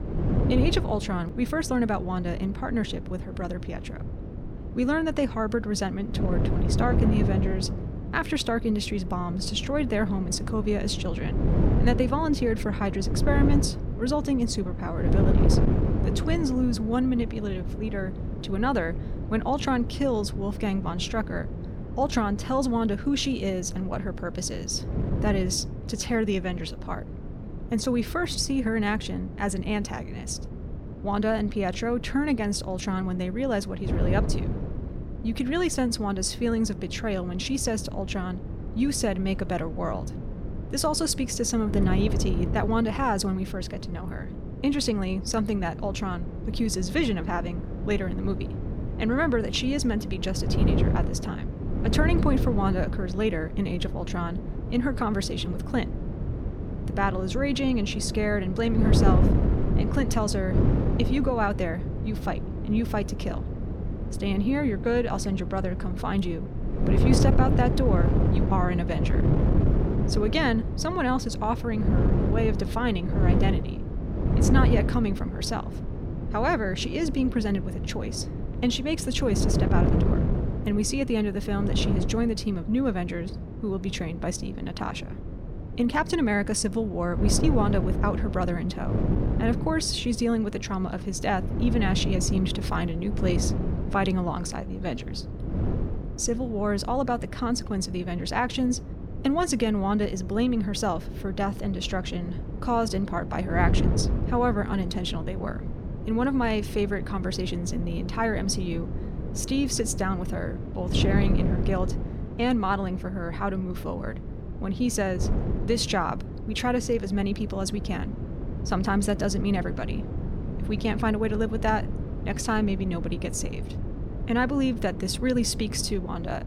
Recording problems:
wind noise on the microphone; heavy; 8 dB below the speech

